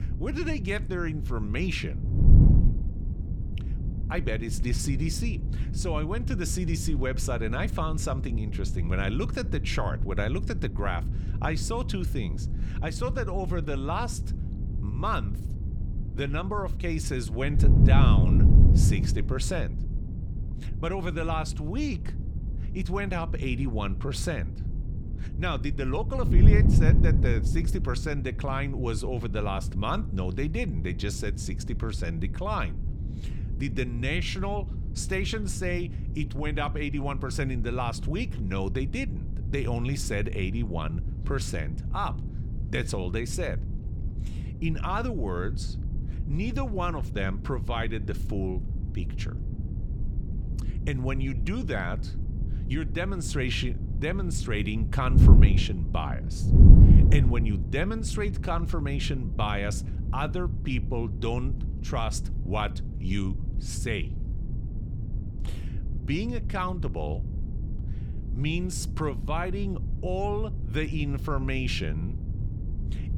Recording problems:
wind noise on the microphone; heavy; 9 dB below the speech

